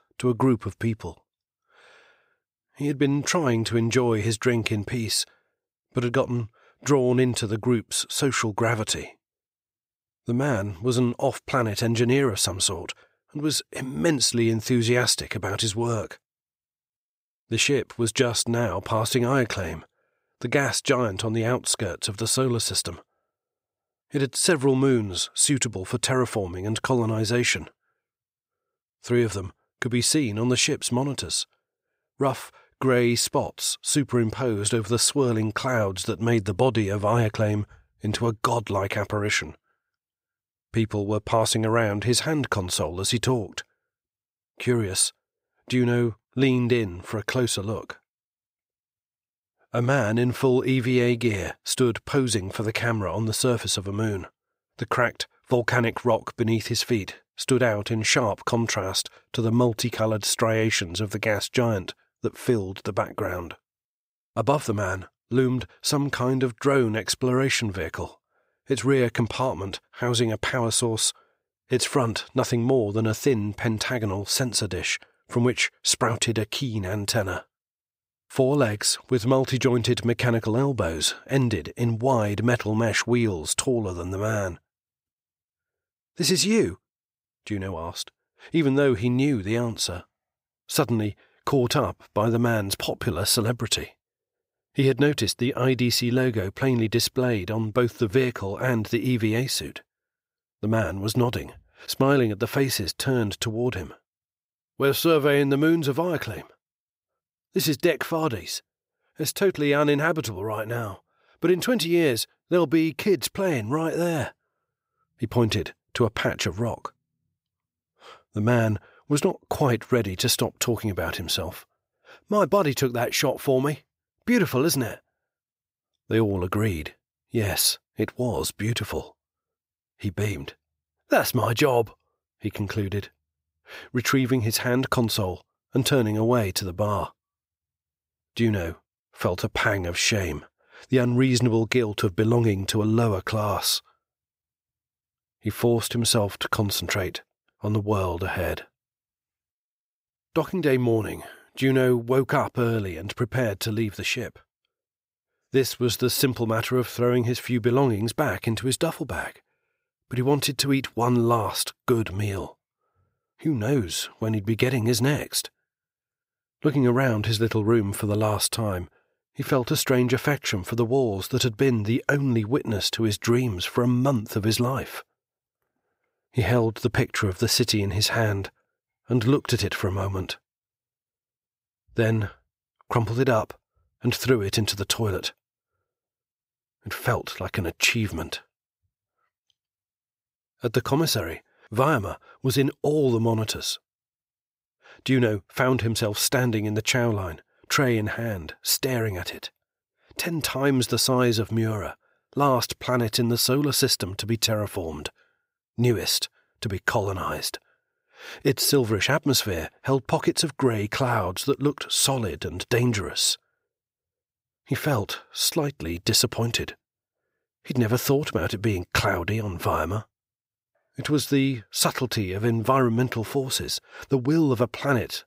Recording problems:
none

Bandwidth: 15.5 kHz